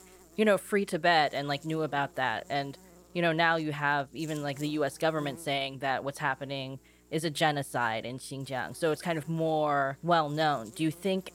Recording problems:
electrical hum; faint; throughout; 60 Hz, 30 dB below the speech

